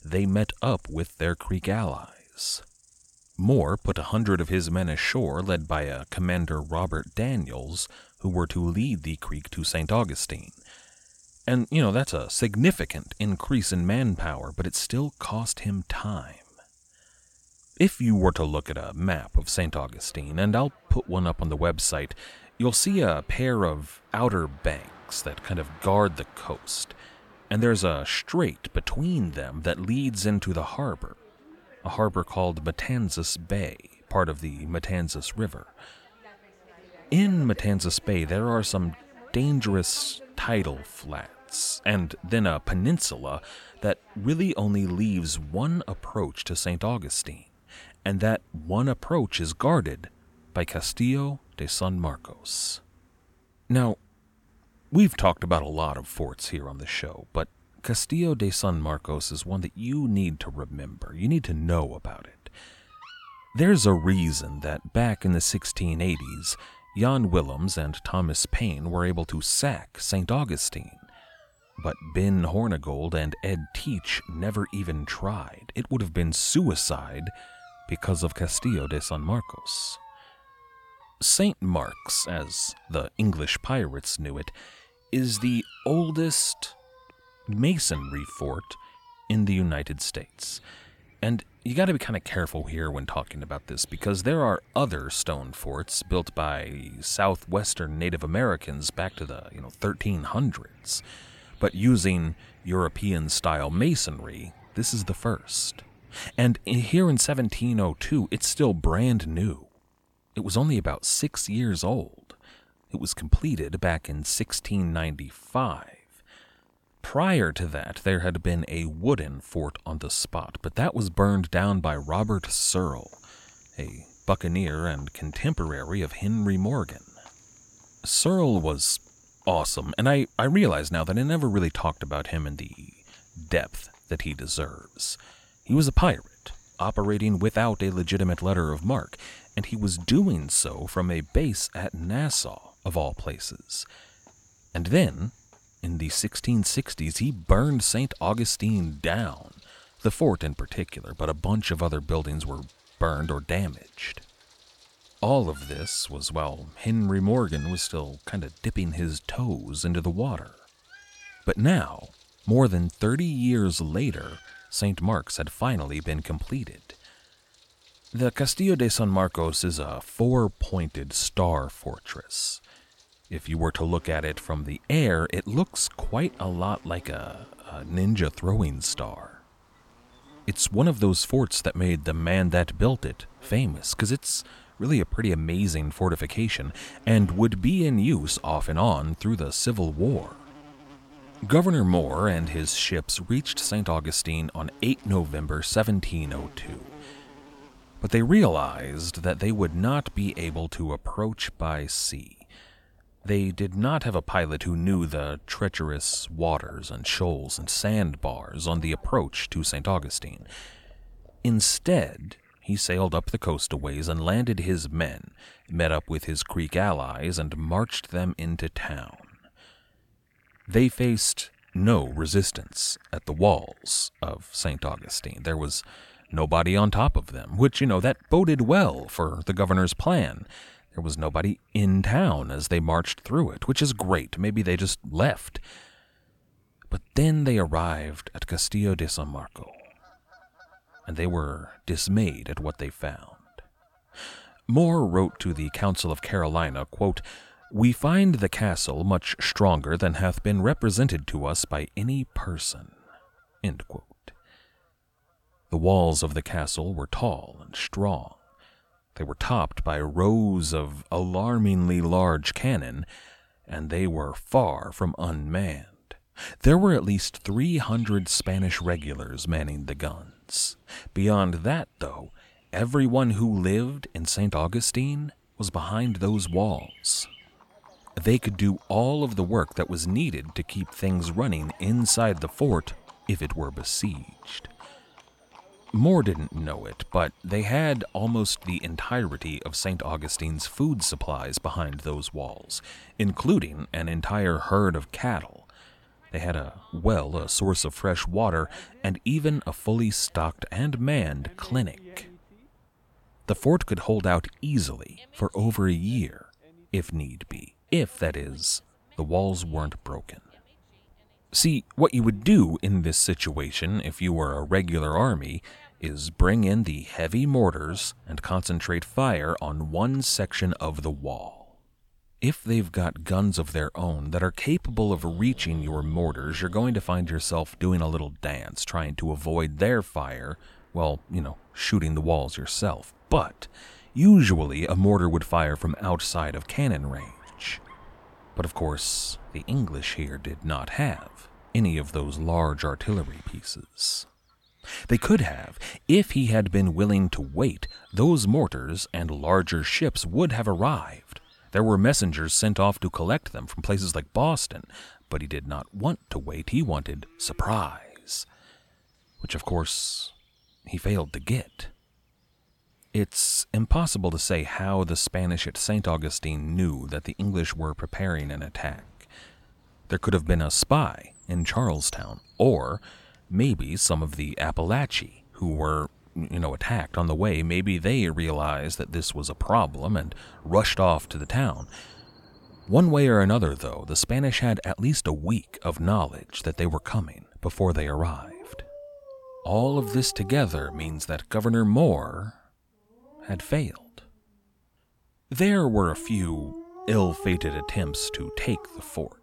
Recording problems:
animal sounds; faint; throughout; 25 dB below the speech

